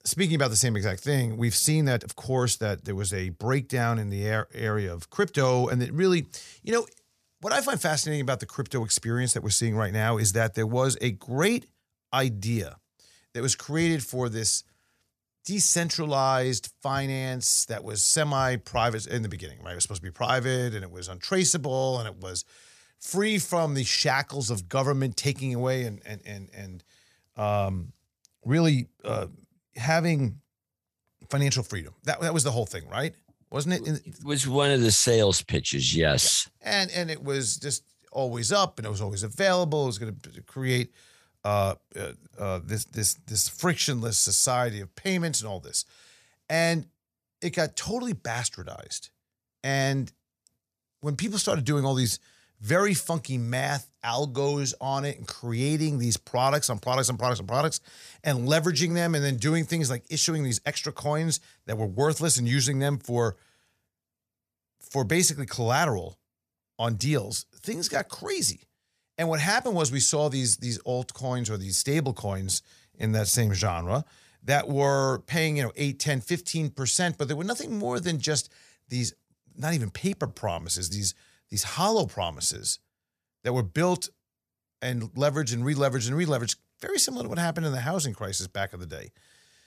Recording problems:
uneven, jittery; strongly; from 1.5 s to 1:21

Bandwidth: 14.5 kHz